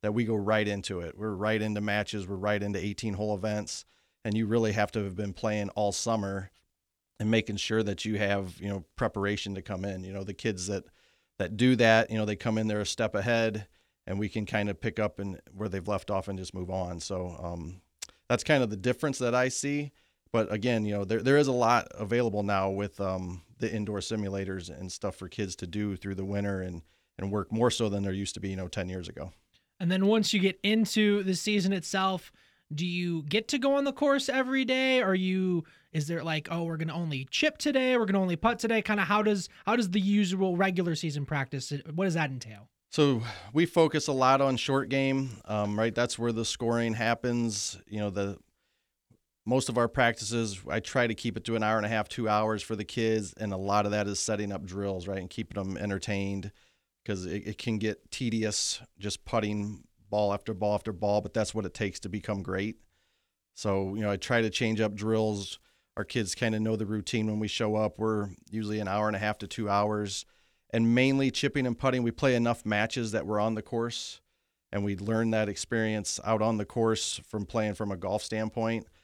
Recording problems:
none

